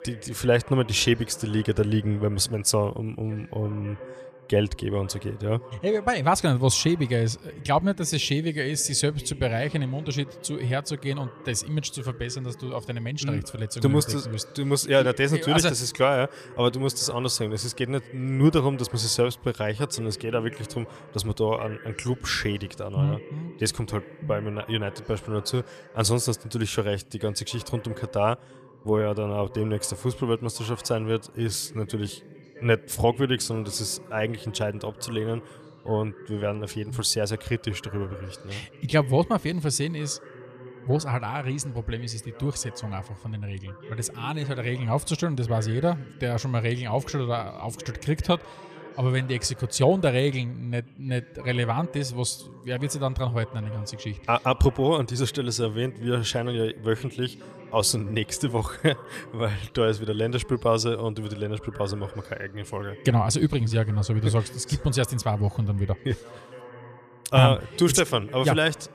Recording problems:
voice in the background; noticeable; throughout; 20 dB below the speech

